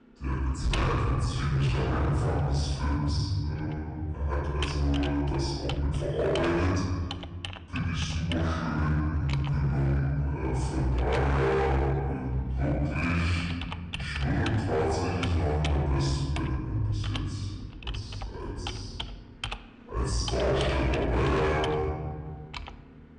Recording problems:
room echo; strong; dies away in 1.9 s
off-mic speech; far
wrong speed and pitch; too slow and too low; 0.7 times normal speed
distortion; slight; 11% of the sound clipped
household noises; noticeable; throughout; 10 dB below the speech
uneven, jittery; strongly; from 1 to 20 s

